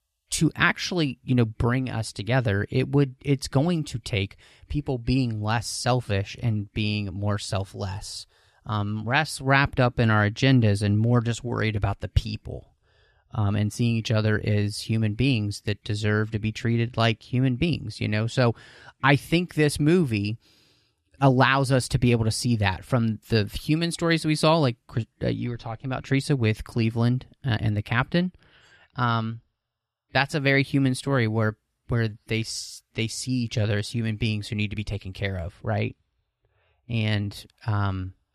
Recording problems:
none

